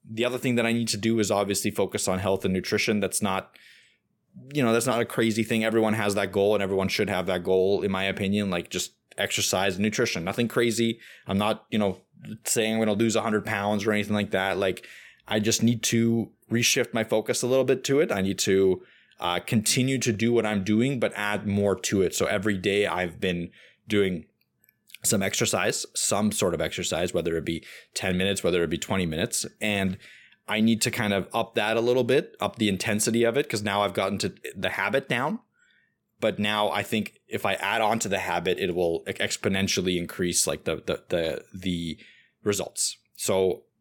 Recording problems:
none

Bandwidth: 17.5 kHz